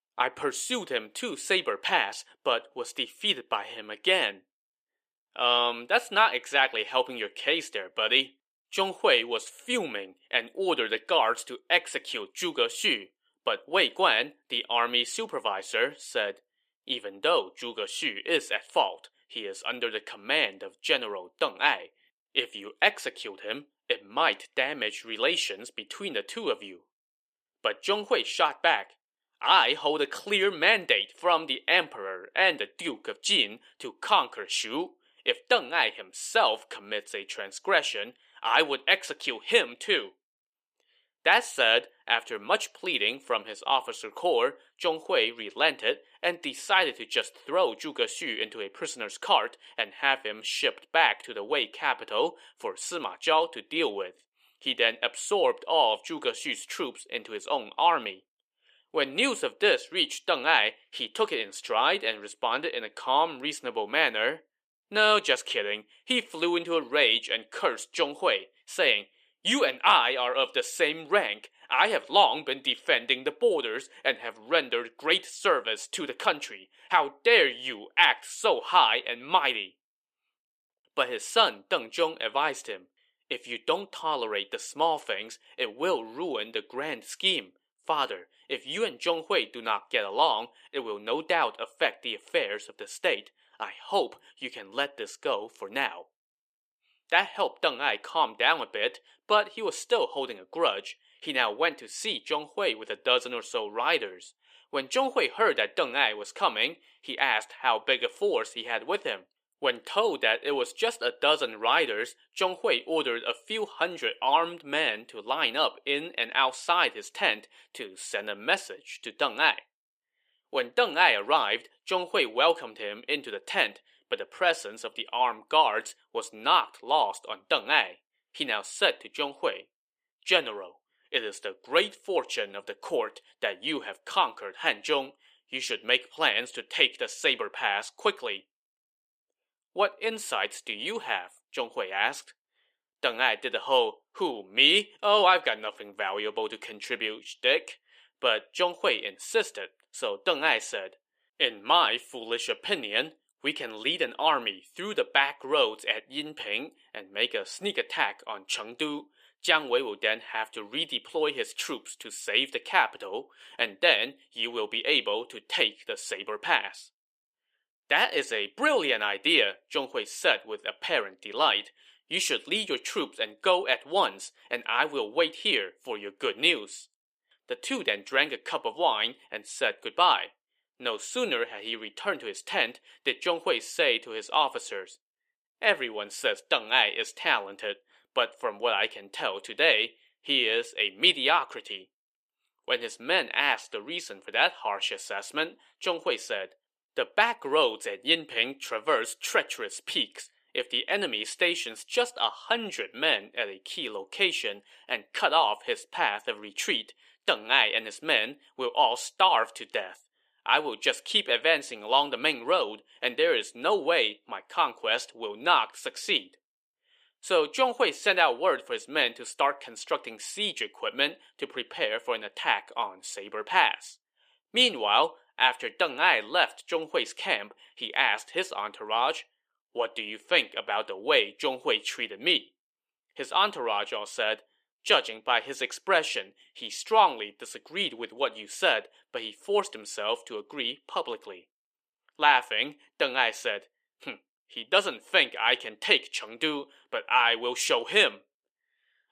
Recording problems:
thin; somewhat; fading below 450 Hz

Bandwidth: 14.5 kHz